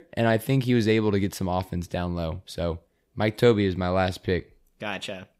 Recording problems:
none

